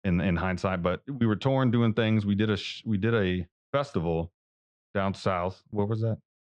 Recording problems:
muffled; very; fading above 3 kHz

